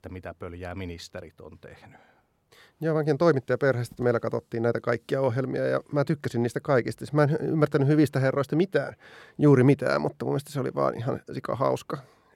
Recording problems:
none

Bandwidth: 16.5 kHz